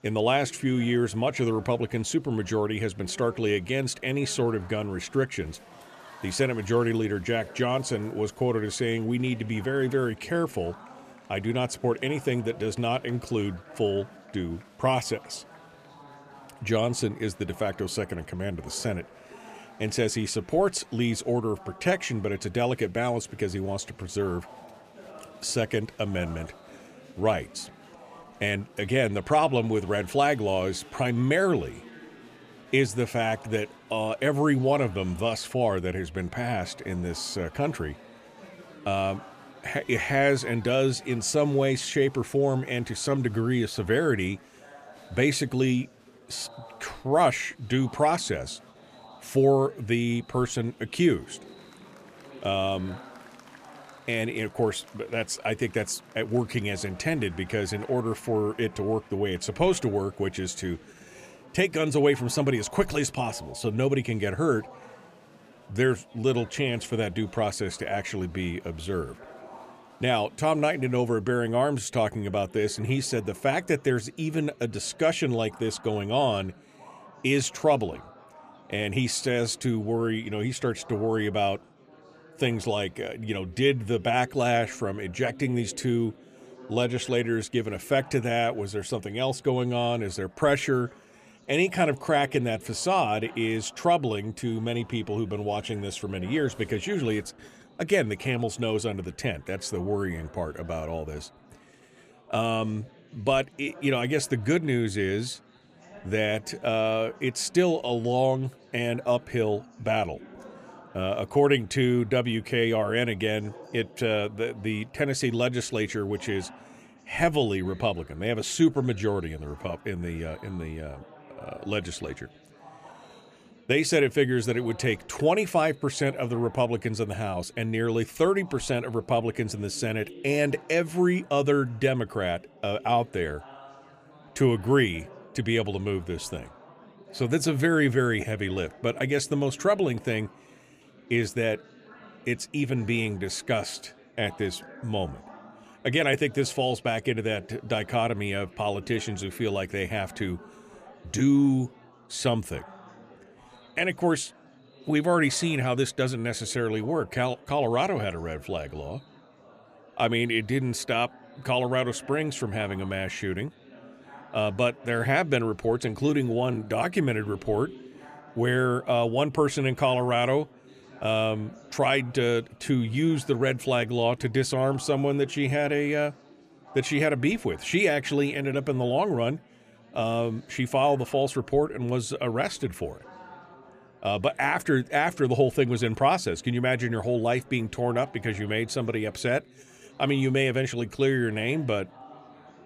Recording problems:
chatter from many people; faint; throughout; 25 dB below the speech

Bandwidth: 14.5 kHz